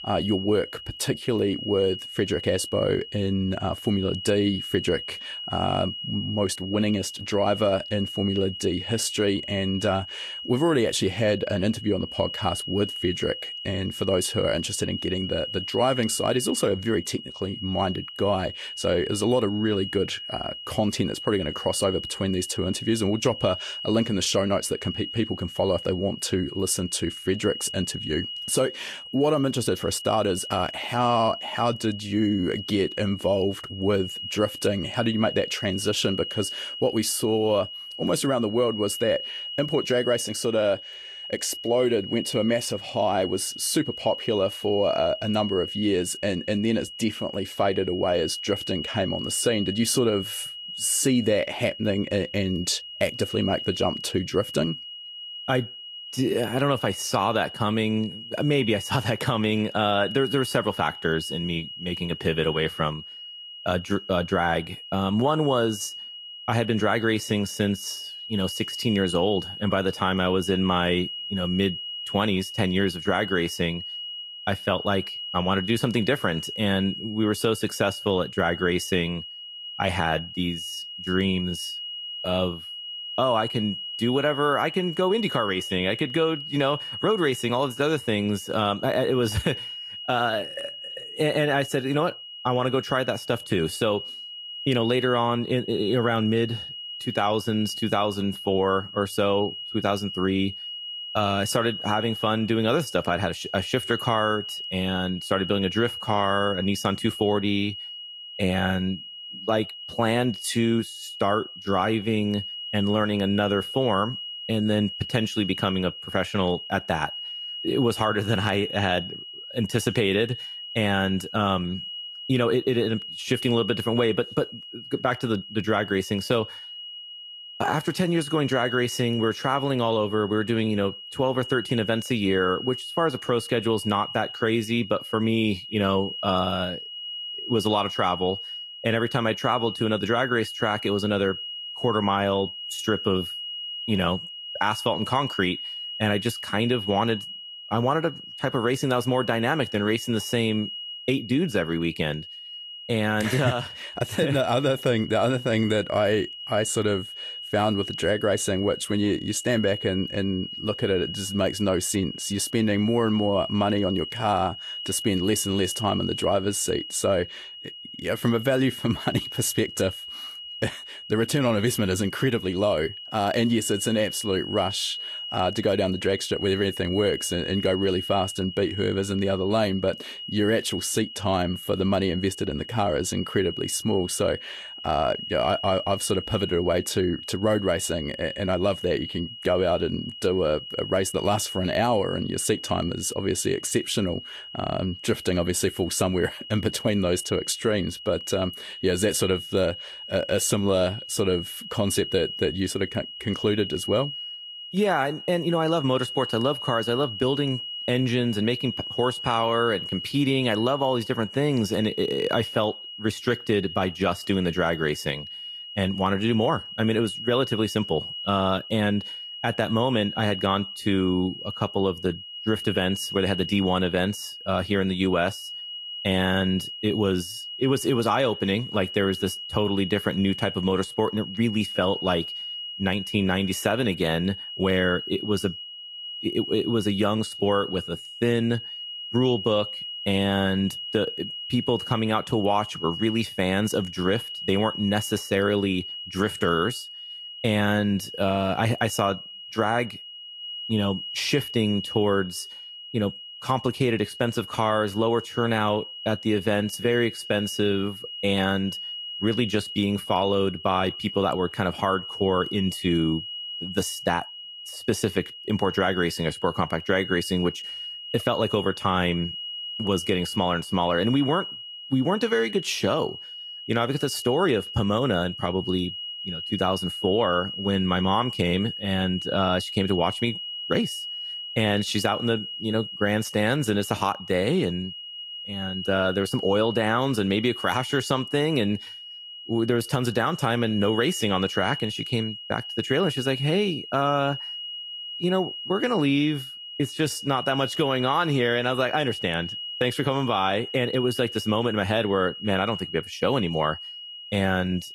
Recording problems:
garbled, watery; slightly; nothing above 12.5 kHz
high-pitched whine; loud; throughout; 3 kHz, 9 dB below the speech

